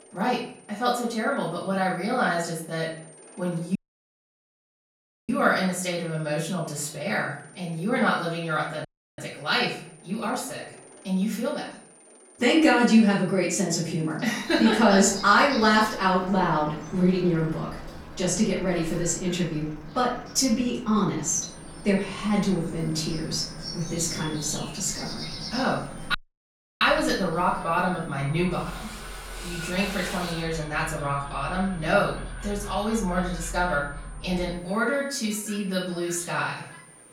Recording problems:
off-mic speech; far
room echo; noticeable; dies away in 0.5 s
animal sounds; noticeable; from 14 s on; 15 dB below the speech
high-pitched whine; faint; until 14 s and from 21 s on; 9 kHz, 25 dB below the speech
machinery noise; faint; throughout; 20 dB below the speech
audio cutting out; at 4 s for 1.5 s, at 9 s and at 26 s for 0.5 s

